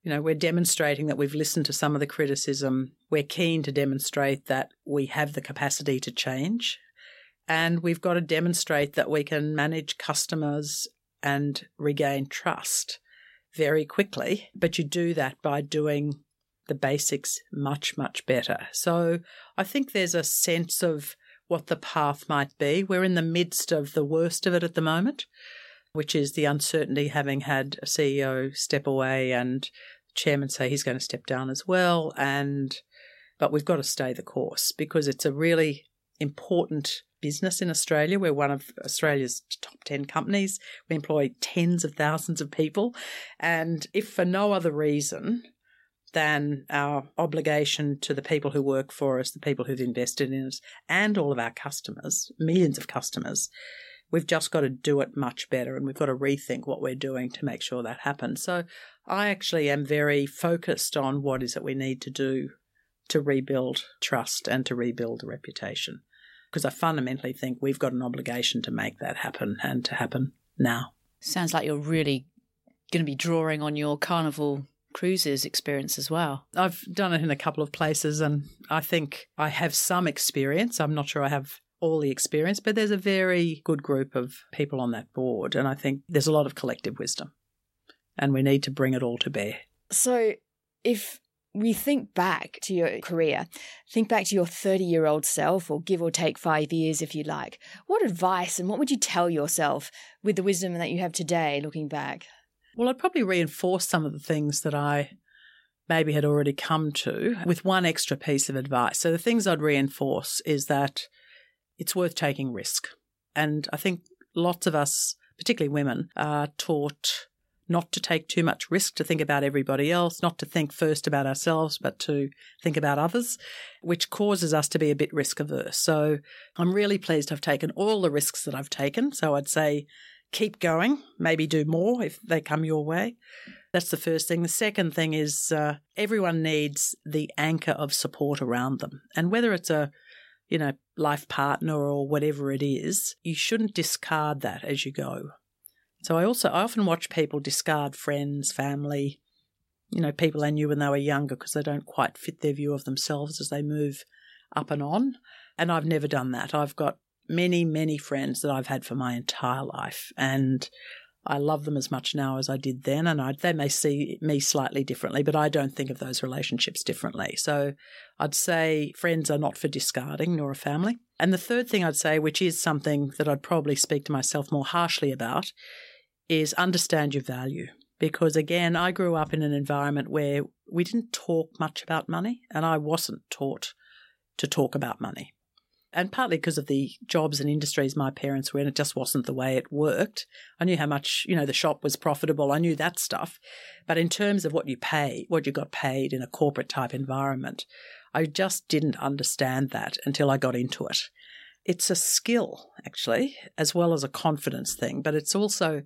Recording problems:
none

